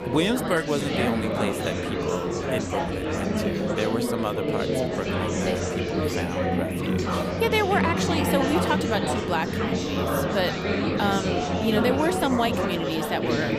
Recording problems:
chatter from many people; very loud; throughout; 2 dB above the speech

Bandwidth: 15 kHz